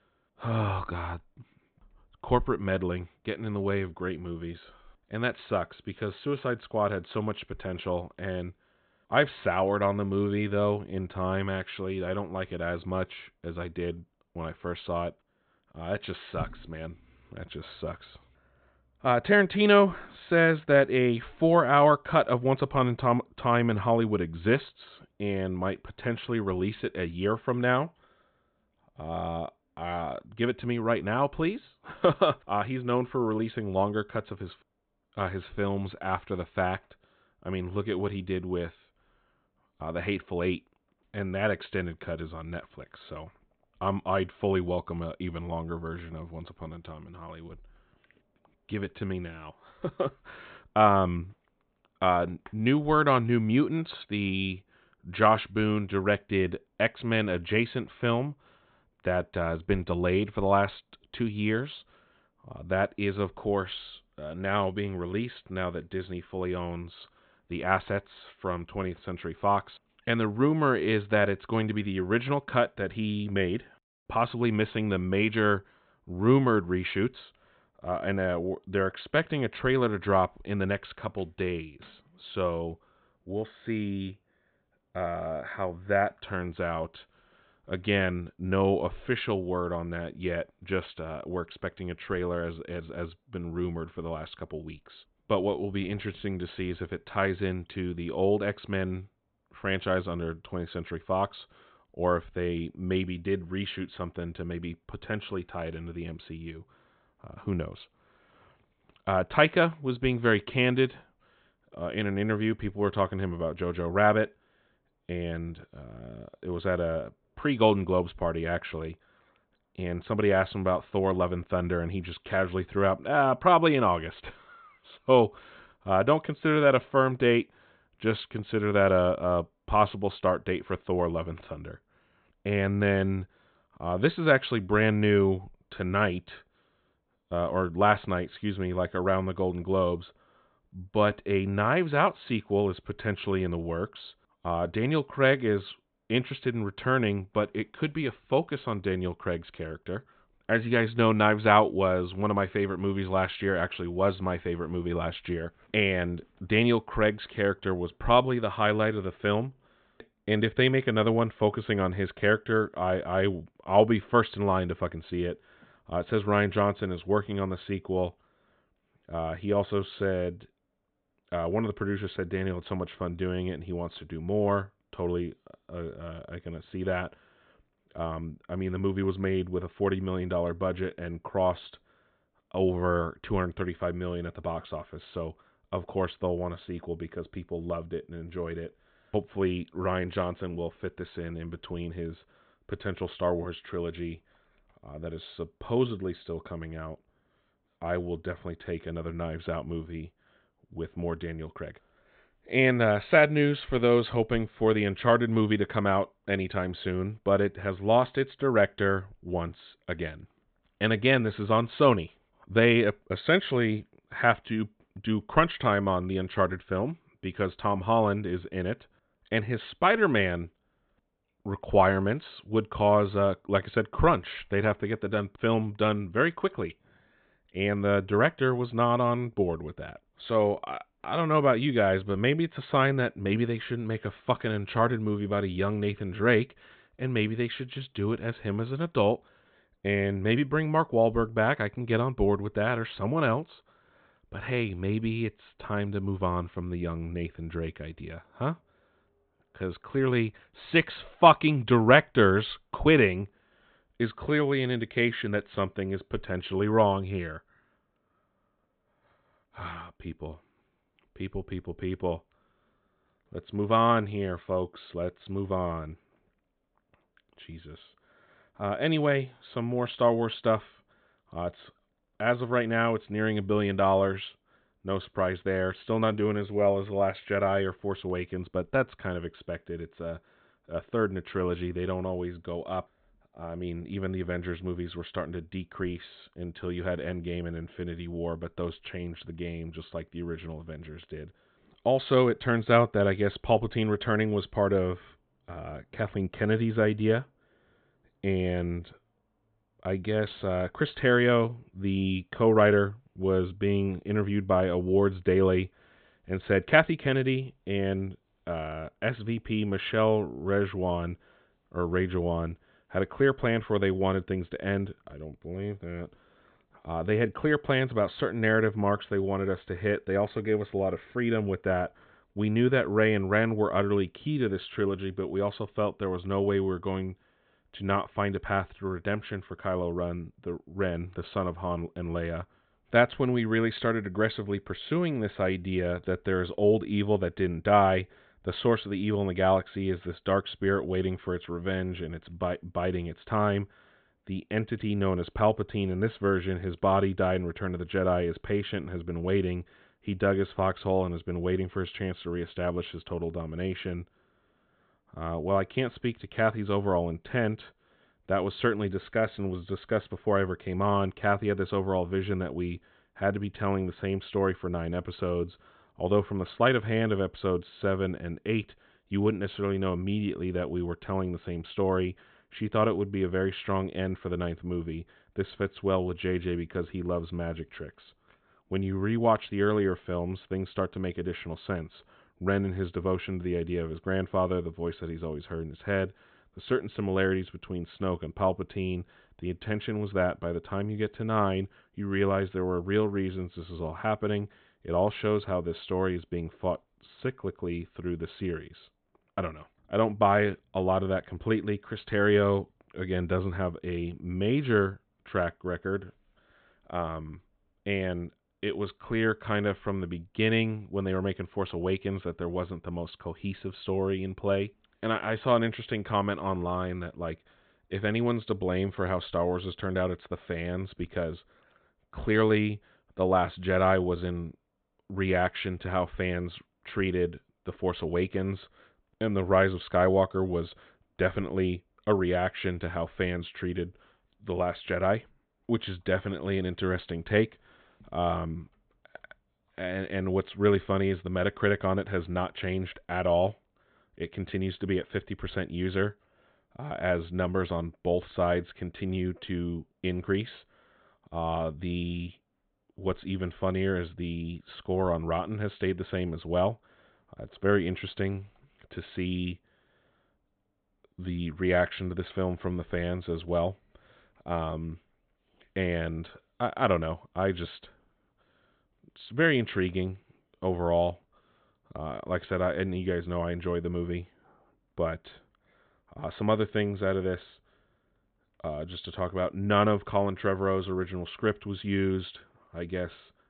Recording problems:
high frequencies cut off; severe; nothing above 4 kHz

